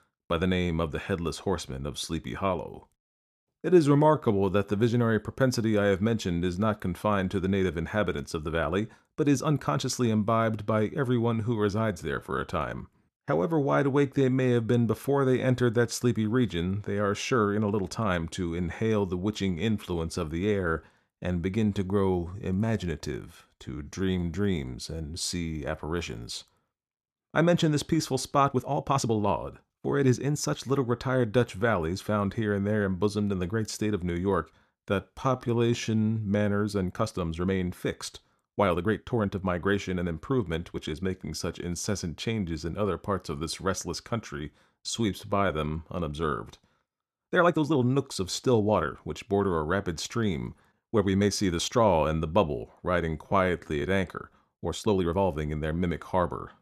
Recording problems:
uneven, jittery; strongly; from 3.5 to 55 s

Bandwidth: 14 kHz